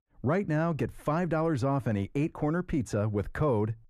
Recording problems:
muffled; slightly; fading above 2.5 kHz

